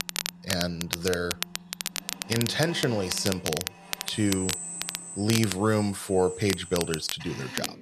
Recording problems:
crackle, like an old record; loud; 5 dB below the speech
machinery noise; noticeable; throughout; 10 dB below the speech

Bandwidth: 13.5 kHz